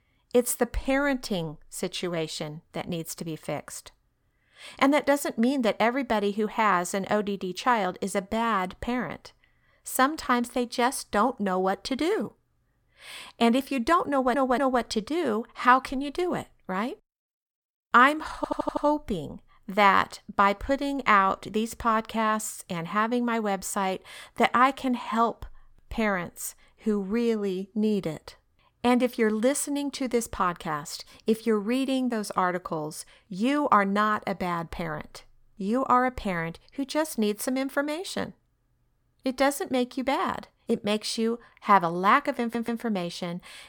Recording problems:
audio stuttering; at 14 s, at 18 s and at 42 s

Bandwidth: 18 kHz